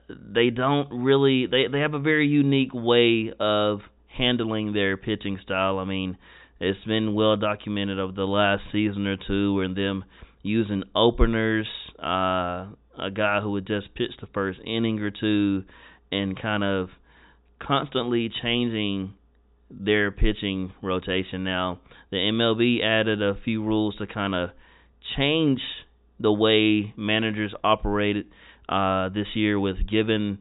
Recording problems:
high frequencies cut off; severe; nothing above 4 kHz

